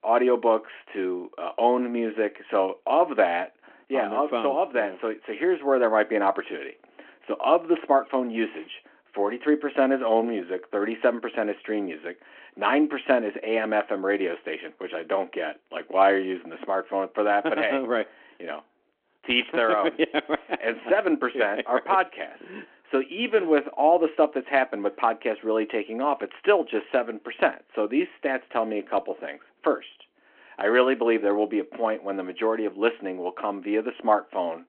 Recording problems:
phone-call audio

